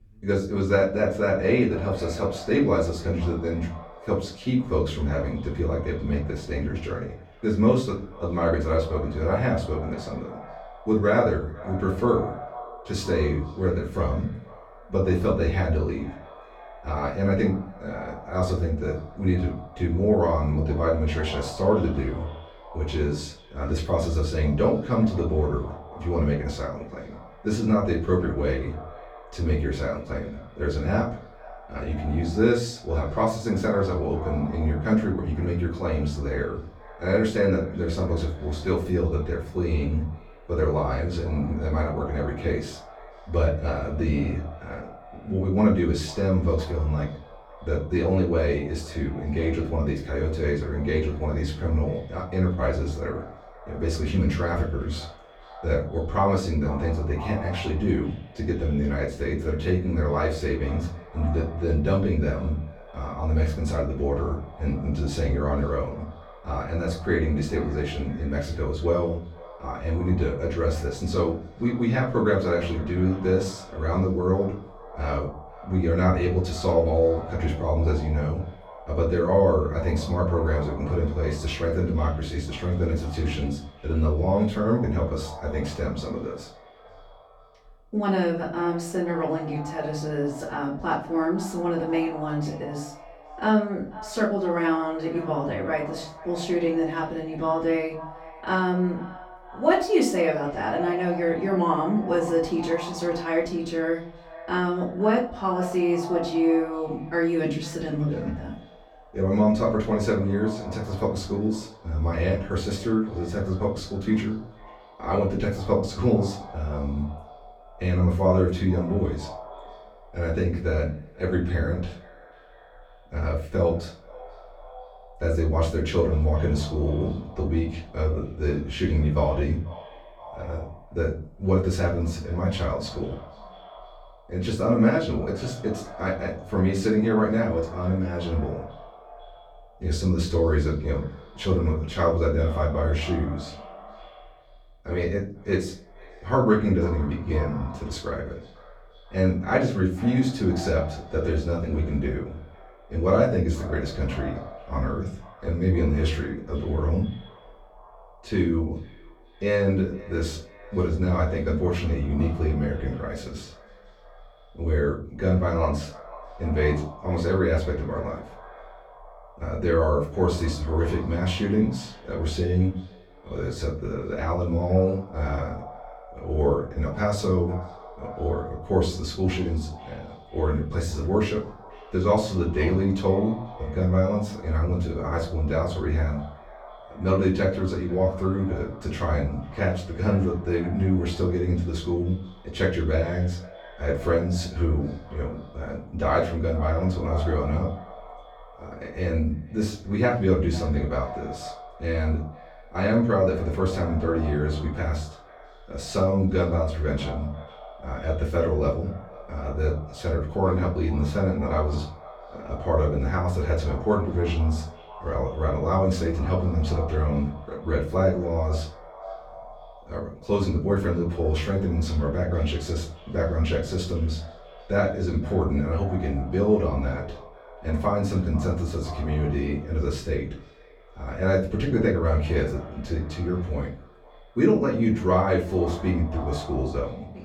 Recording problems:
off-mic speech; far
echo of what is said; noticeable; throughout; 490 ms later, 20 dB below the speech
room echo; slight; dies away in 0.3 s

